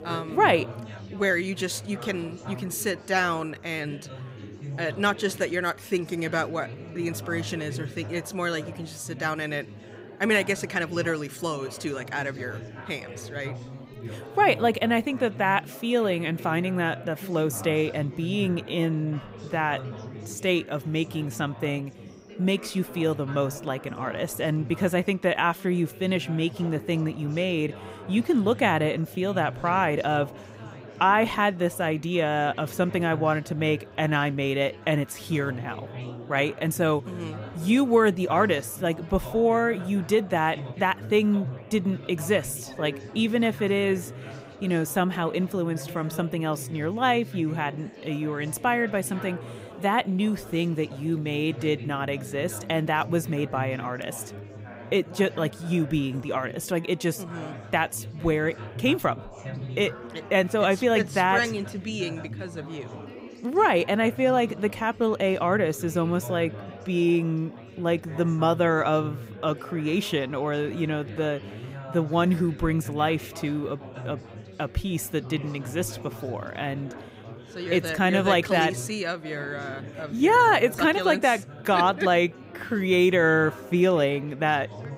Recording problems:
chatter from many people; noticeable; throughout; 15 dB below the speech

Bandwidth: 15.5 kHz